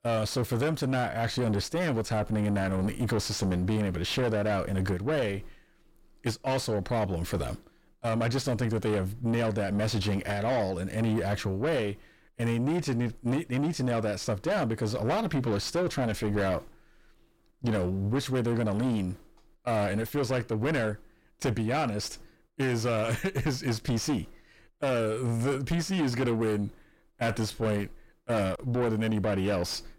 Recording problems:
distortion; heavy; 7 dB below the speech

